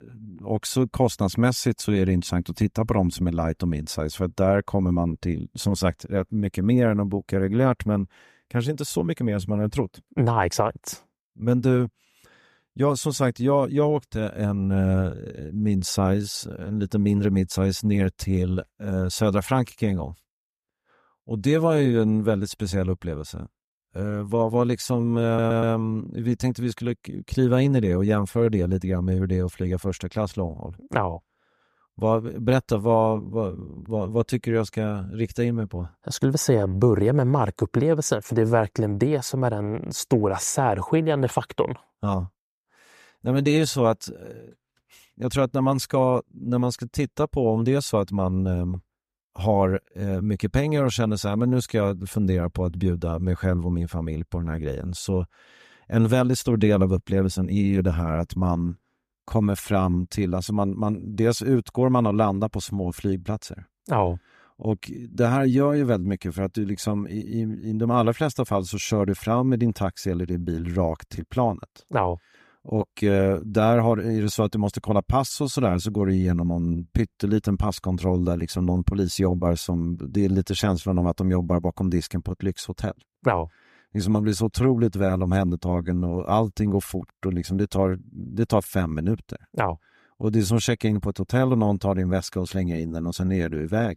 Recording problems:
audio stuttering; at 25 s

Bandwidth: 14.5 kHz